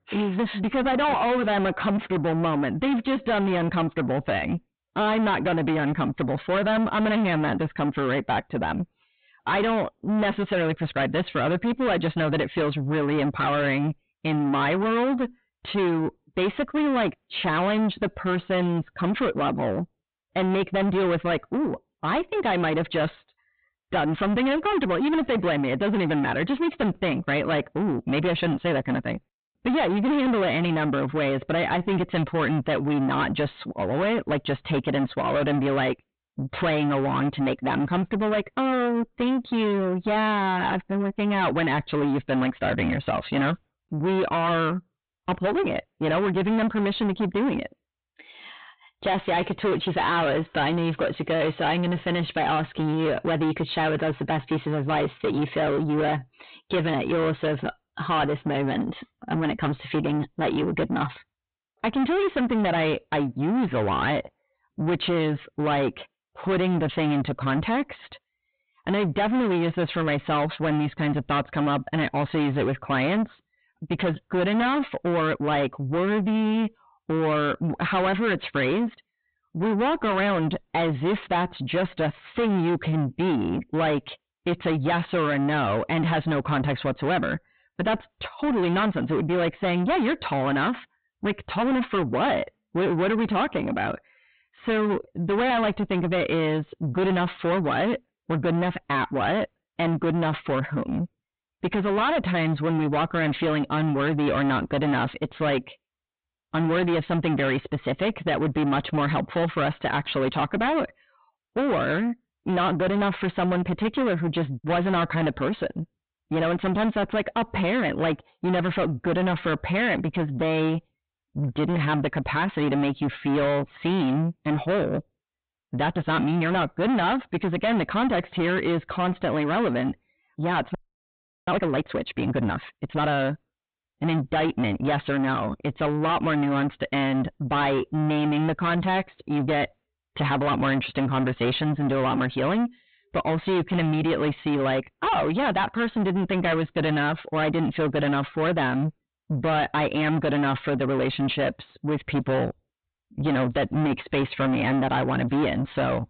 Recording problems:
distortion; heavy; 6 dB below the speech
high frequencies cut off; severe; nothing above 4 kHz
audio freezing; at 2:11 for 0.5 s

